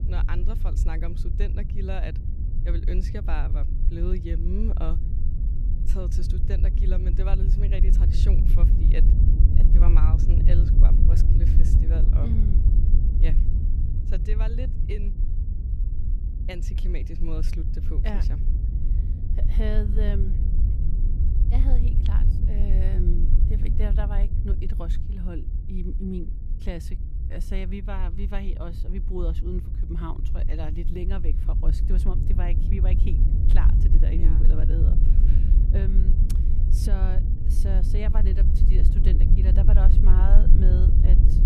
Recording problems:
low rumble; loud; throughout; 2 dB below the speech

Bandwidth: 15 kHz